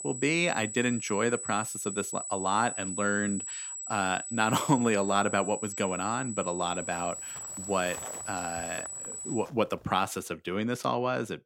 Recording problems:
high-pitched whine; loud; until 9.5 s; 8 kHz, 6 dB below the speech
footsteps; faint; from 7 to 10 s; peak 15 dB below the speech

